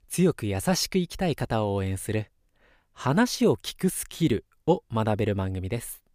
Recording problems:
none

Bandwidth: 15 kHz